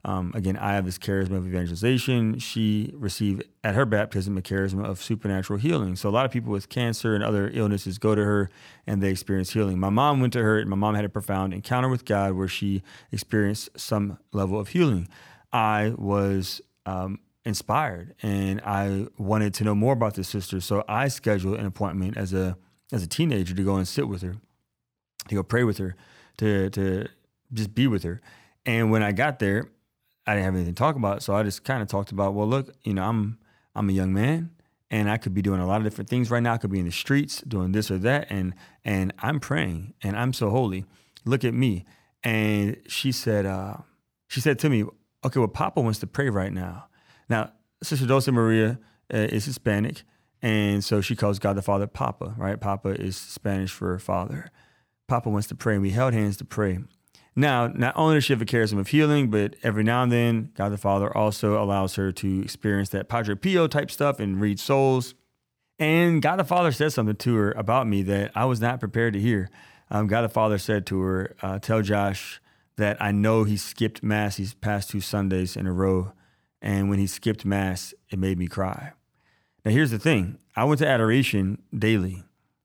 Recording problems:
none

